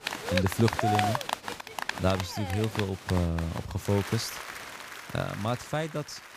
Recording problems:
crowd noise; loud; throughout; 4 dB below the speech

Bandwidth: 15 kHz